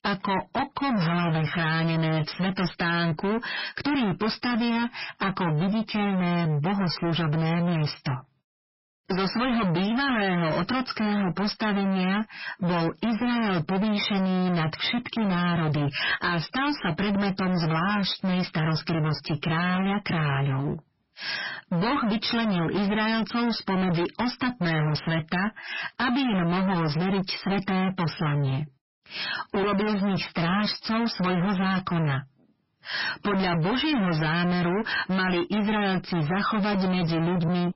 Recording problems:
distortion; heavy; 48% of the sound clipped
garbled, watery; badly; nothing above 5.5 kHz

